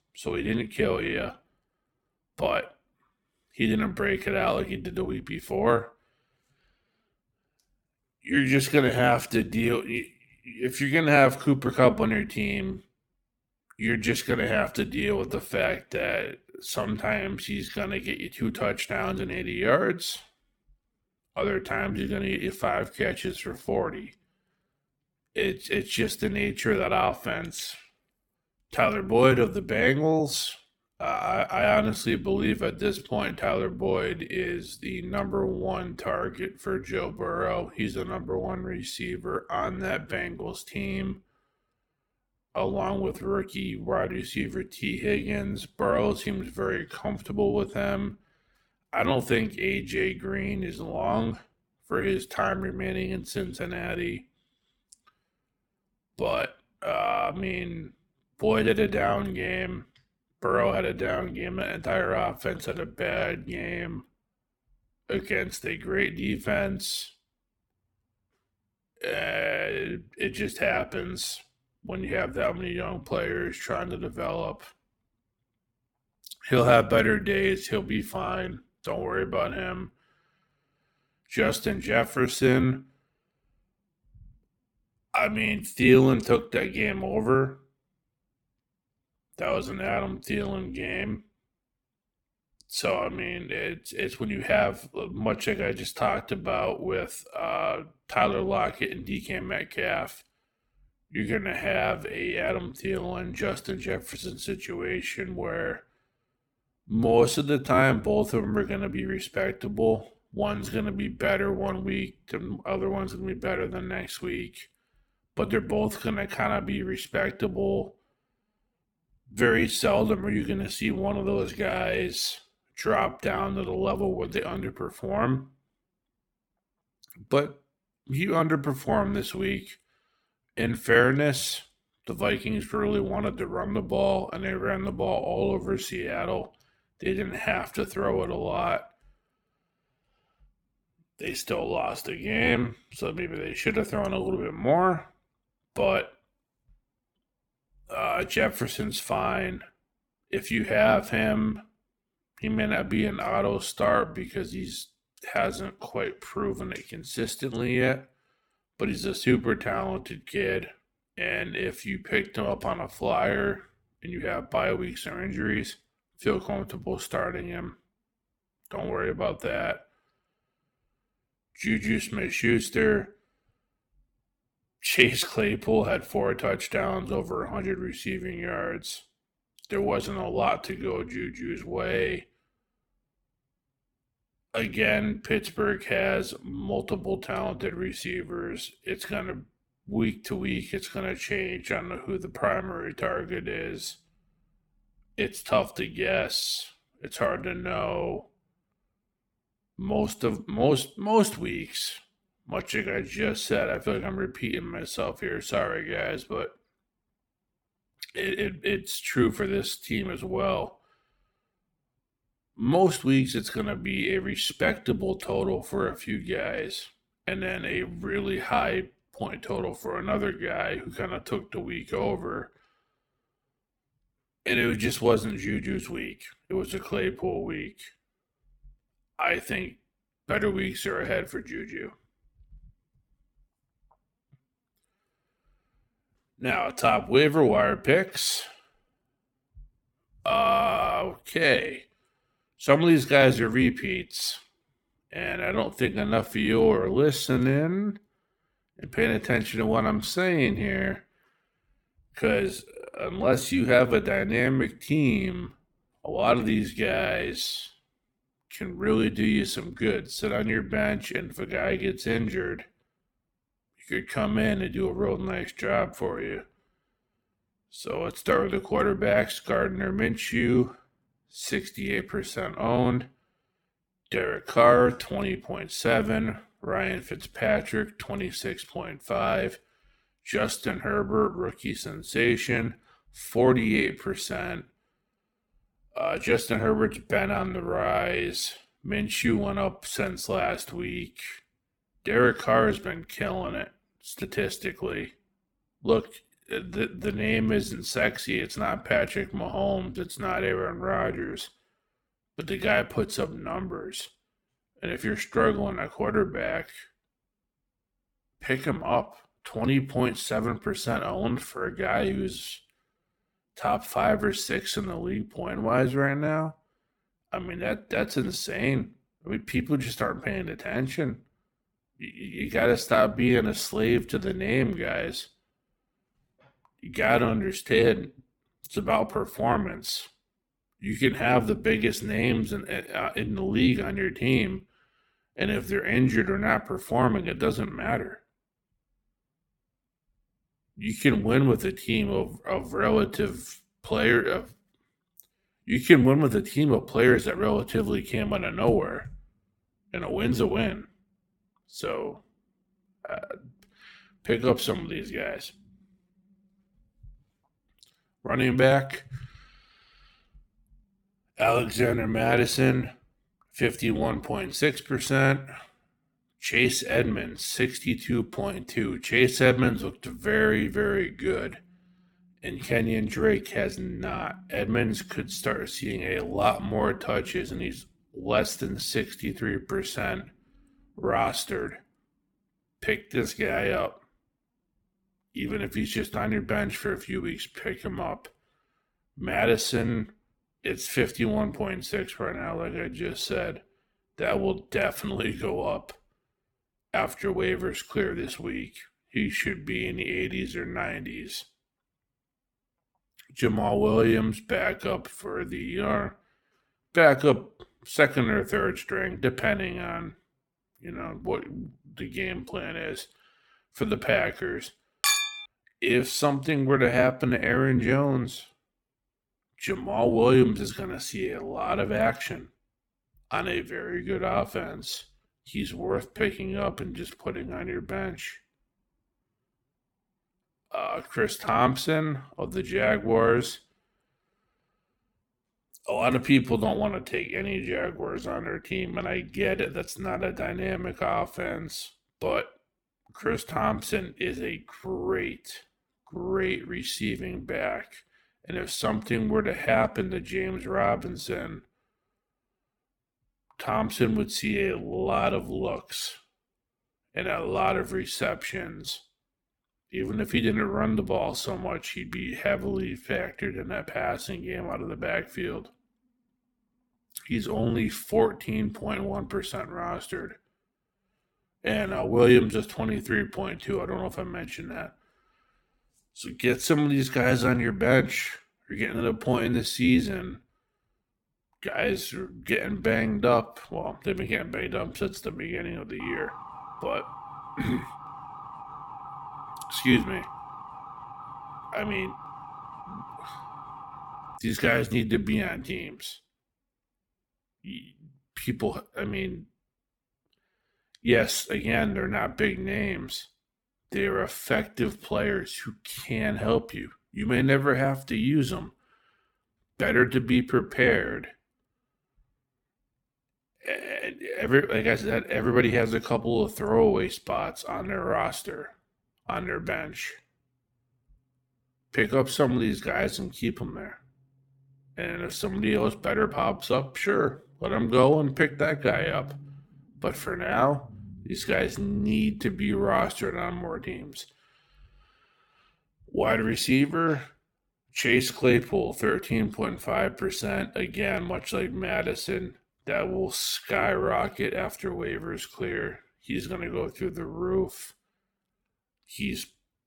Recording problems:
wrong speed, natural pitch; too slow; 0.7 times normal speed
clattering dishes; loud; at 6:55; peak 5 dB above the speech
siren; faint; from 8:06 to 8:14; peak 15 dB below the speech

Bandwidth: 17.5 kHz